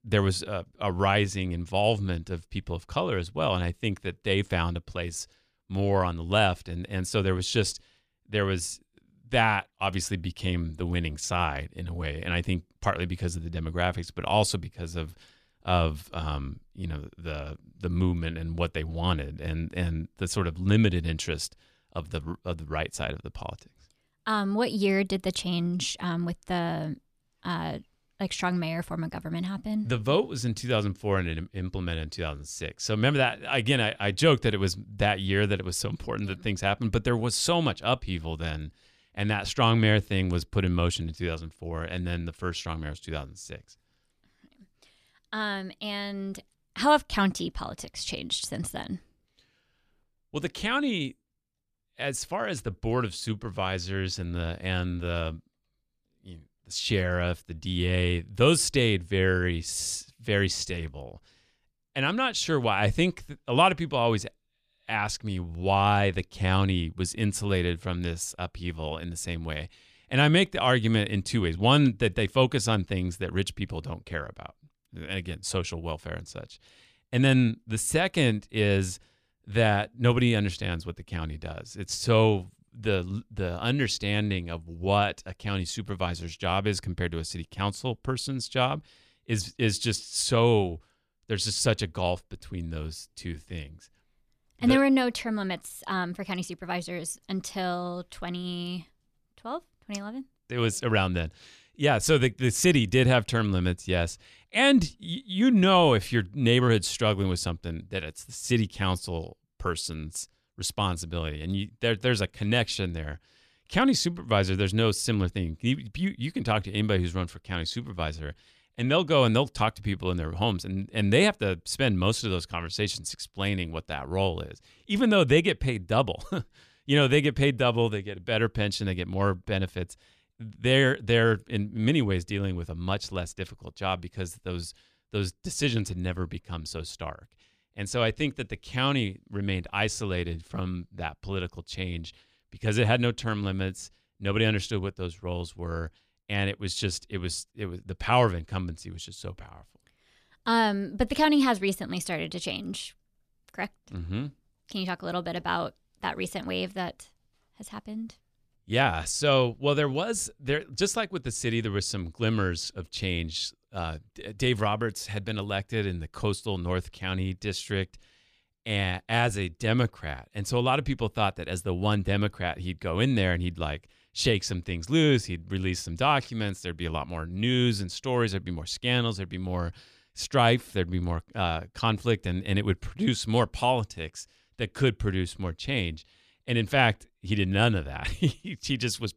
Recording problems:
none

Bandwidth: 14.5 kHz